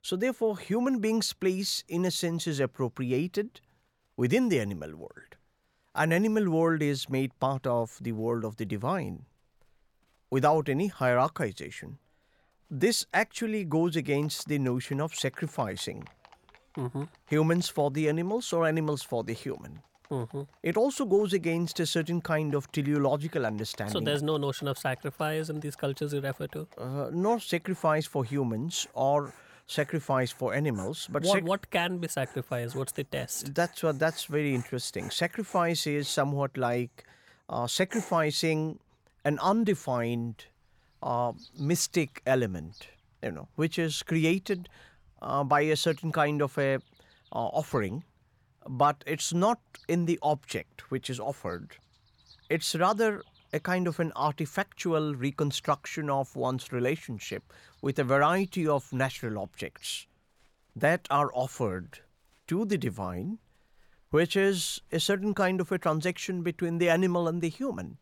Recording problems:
animal sounds; faint; throughout; 25 dB below the speech

